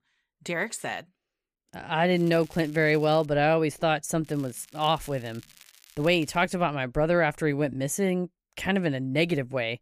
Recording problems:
crackling; faint; from 2 to 3.5 s and from 4 to 6.5 s; 25 dB below the speech

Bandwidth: 15 kHz